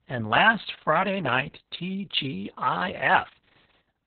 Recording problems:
garbled, watery; badly; nothing above 4 kHz

